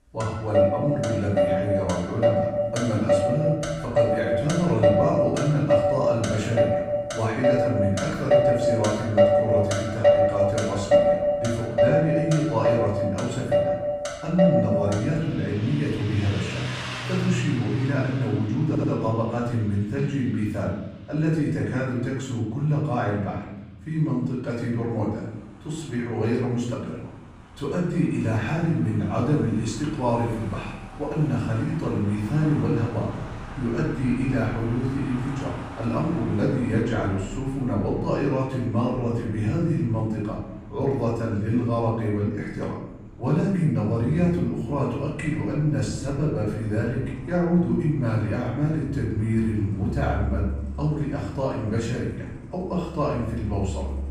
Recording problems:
off-mic speech; far
room echo; noticeable; dies away in 0.9 s
traffic noise; very loud; throughout; as loud as the speech
audio stuttering; at 19 s

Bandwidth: 15.5 kHz